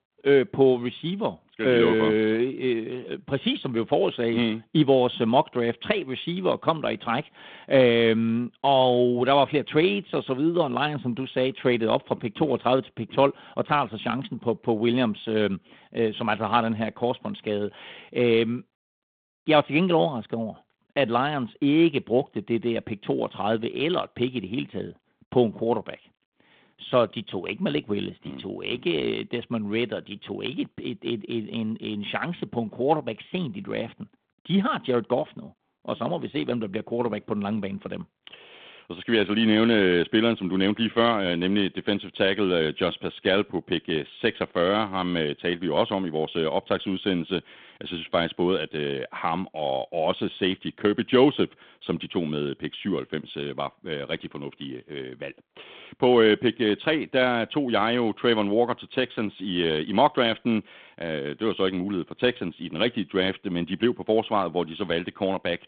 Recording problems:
phone-call audio

